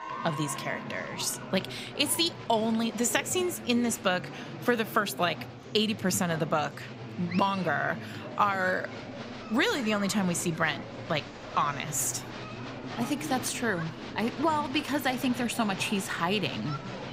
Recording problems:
murmuring crowd; noticeable; throughout; 10 dB below the speech

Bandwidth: 15.5 kHz